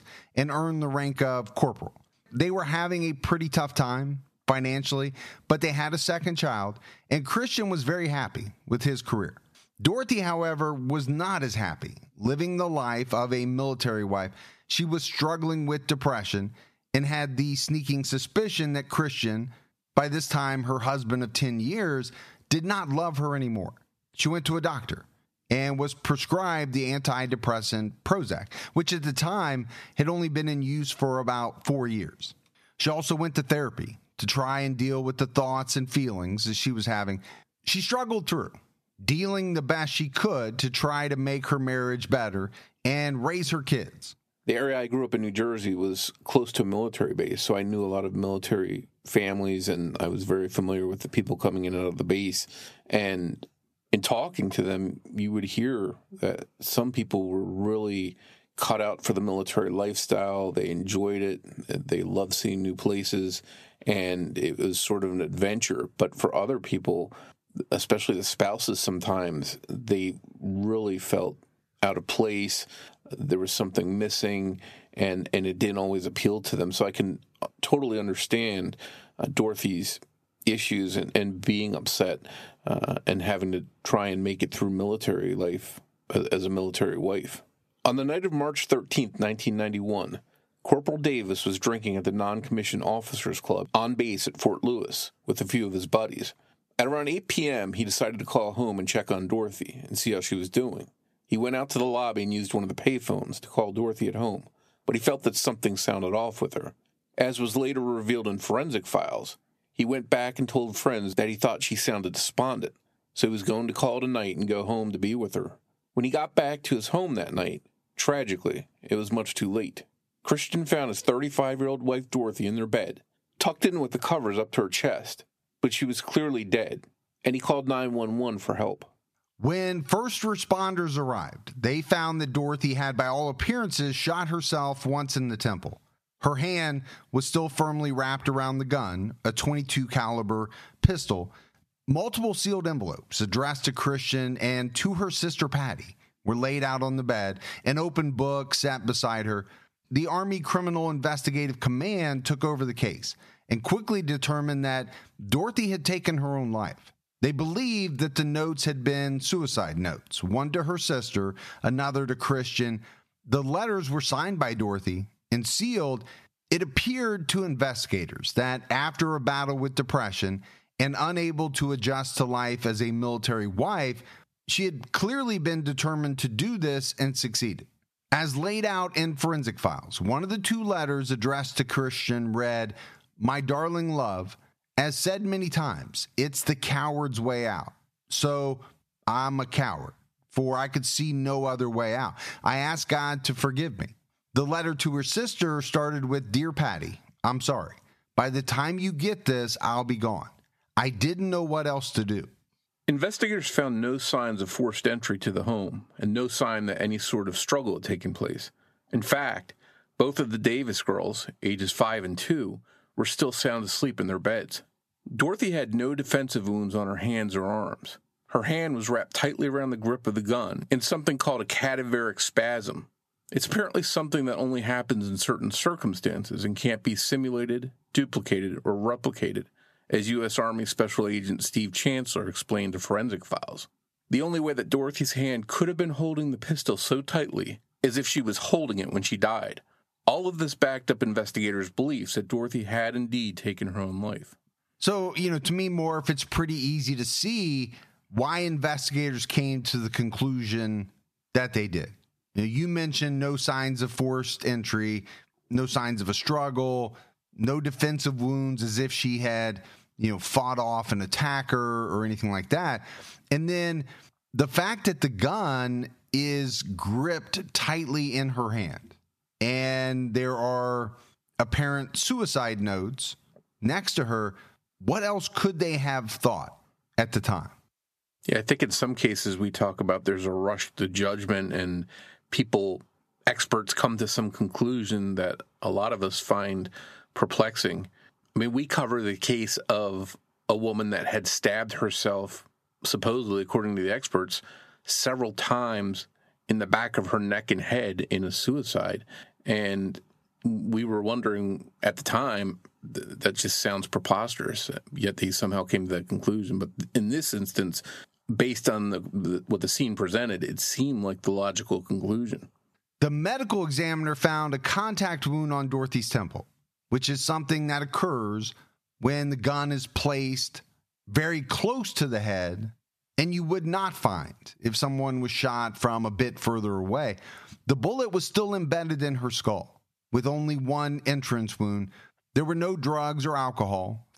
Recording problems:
squashed, flat; heavily

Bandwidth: 14.5 kHz